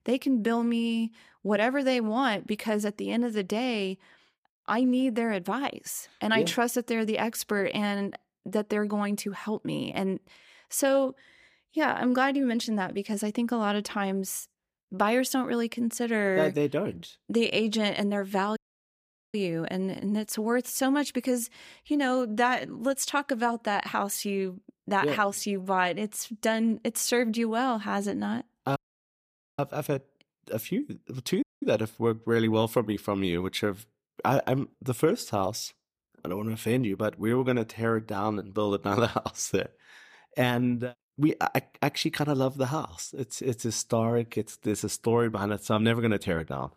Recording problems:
audio cutting out; at 19 s for 1 s, at 29 s for 1 s and at 31 s

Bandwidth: 15 kHz